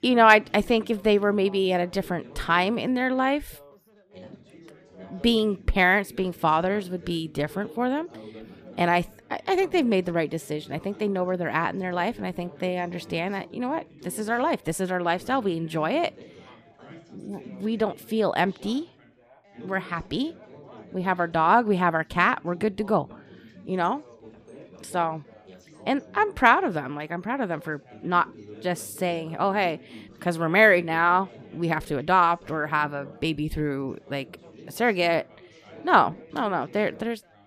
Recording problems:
background chatter; faint; throughout; 4 voices, 20 dB below the speech

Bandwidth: 14.5 kHz